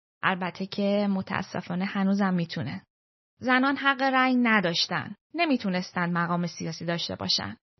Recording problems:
garbled, watery; slightly; nothing above 6 kHz

